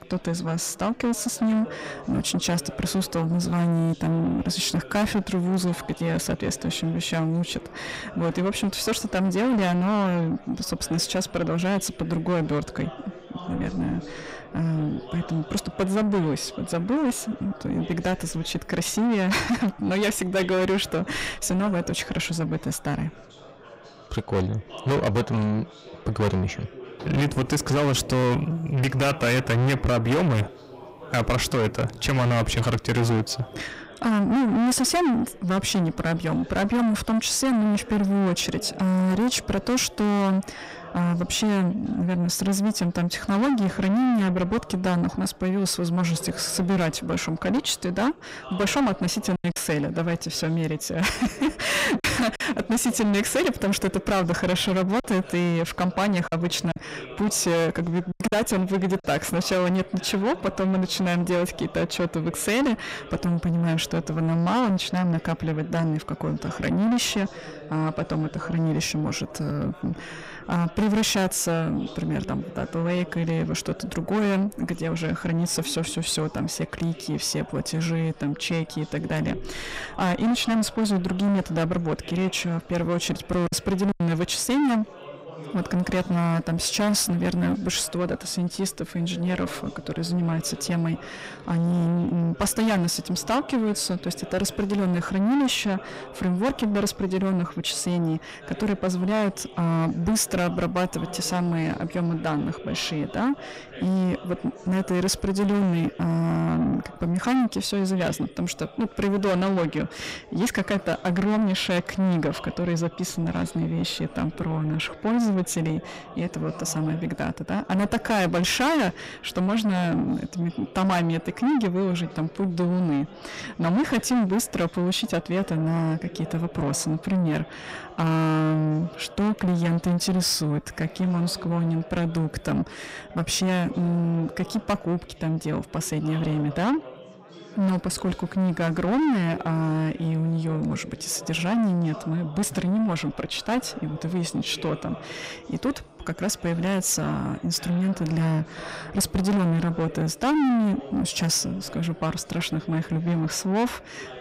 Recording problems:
distortion; heavy; 5 dB below the speech
chatter from many people; noticeable; throughout; 20 dB below the speech
choppy; very; from 49 to 52 s, from 55 to 58 s and at 1:23; 7% of the speech affected

